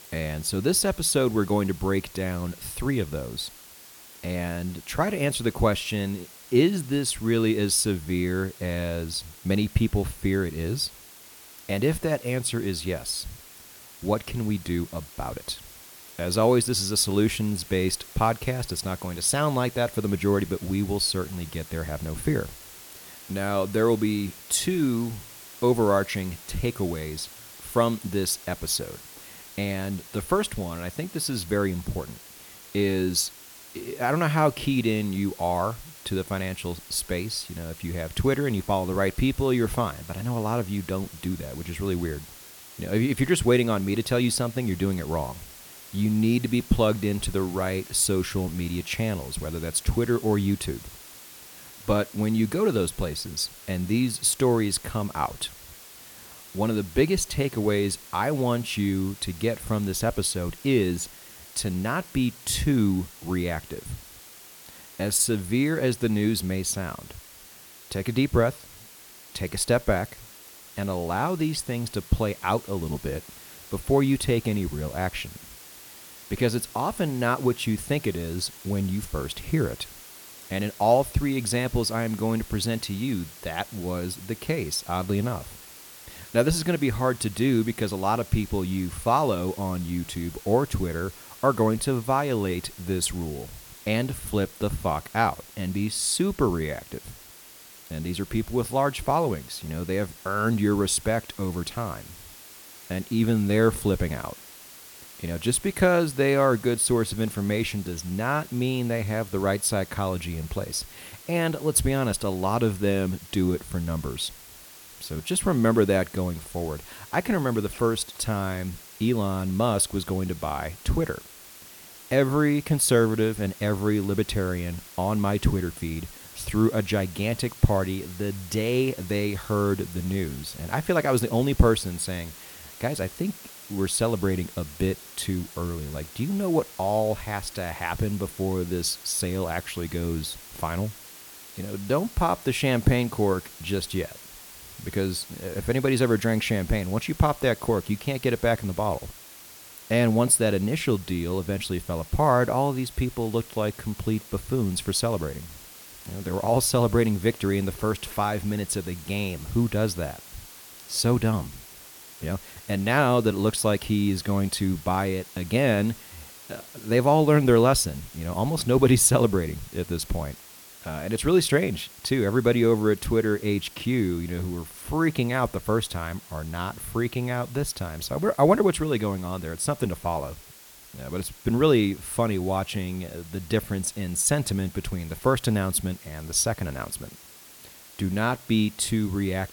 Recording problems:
hiss; noticeable; throughout; 15 dB below the speech

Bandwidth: 18.5 kHz